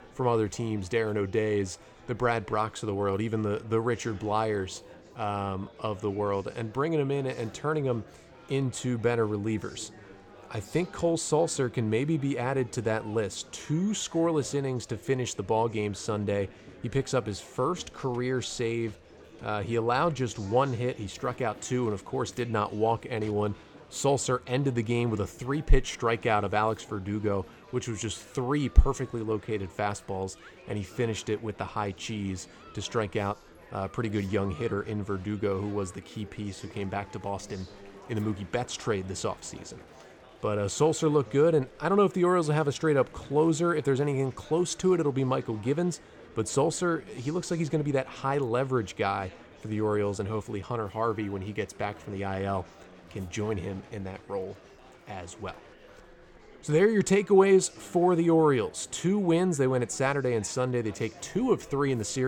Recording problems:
chatter from many people; faint; throughout; 20 dB below the speech
abrupt cut into speech; at the end

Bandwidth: 18 kHz